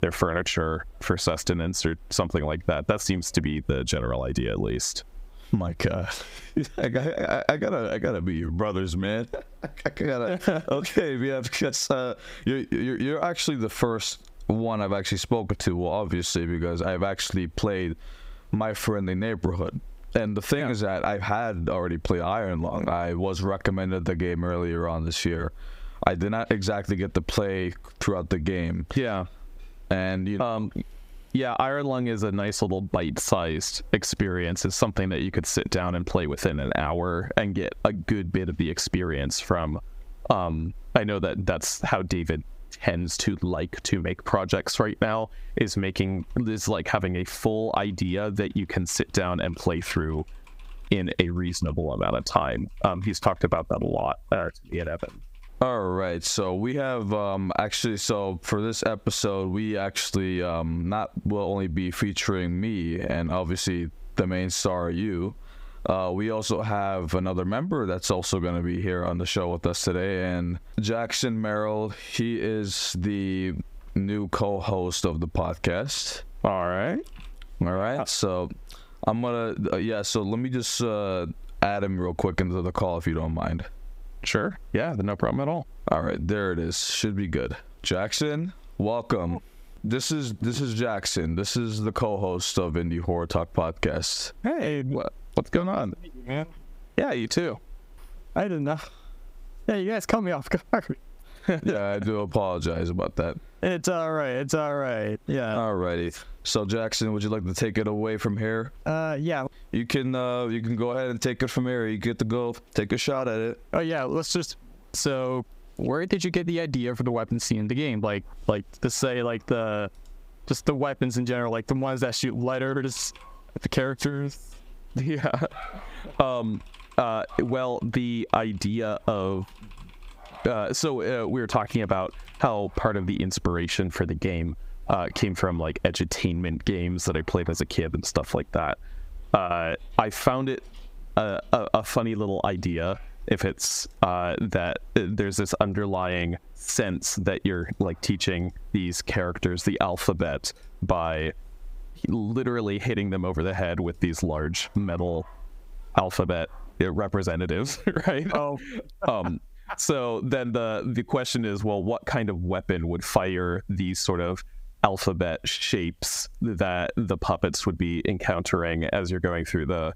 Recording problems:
squashed, flat; heavily

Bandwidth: 15.5 kHz